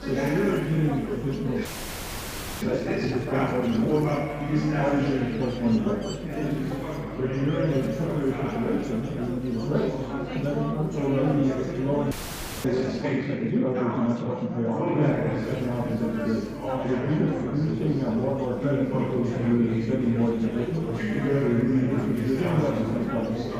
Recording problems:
off-mic speech; far
room echo; noticeable; dies away in 3 s
chatter from many people; loud; throughout; 2 dB below the speech
electrical hum; noticeable; until 13 s and from 15 s on; 50 Hz, 15 dB below the speech
audio freezing; at 1.5 s for 1 s and at 12 s for 0.5 s

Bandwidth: 15 kHz